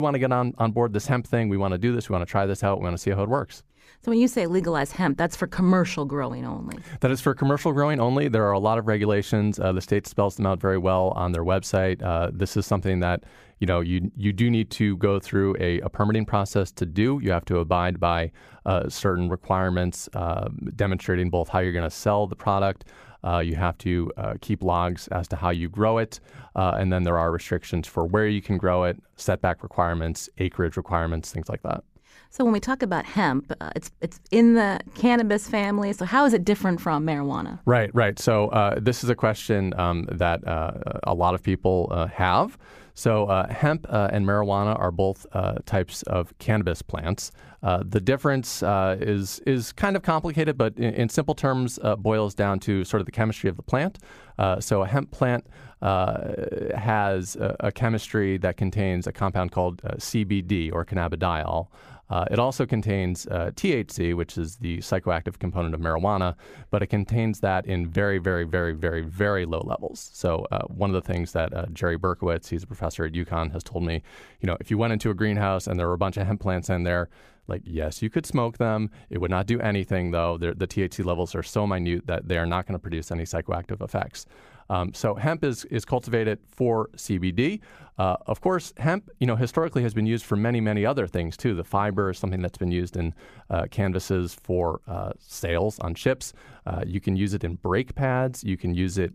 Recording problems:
abrupt cut into speech; at the start

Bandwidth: 15 kHz